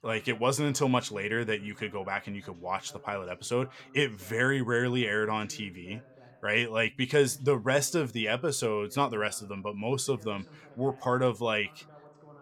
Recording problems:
voice in the background; faint; throughout; 25 dB below the speech

